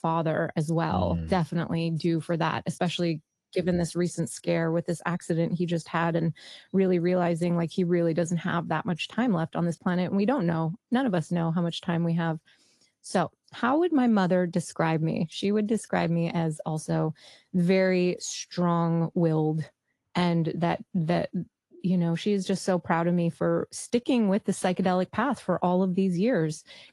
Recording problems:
garbled, watery; slightly

